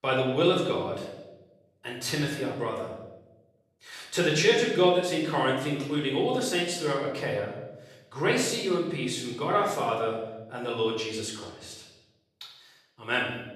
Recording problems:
off-mic speech; far
room echo; noticeable; dies away in 0.9 s

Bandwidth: 13.5 kHz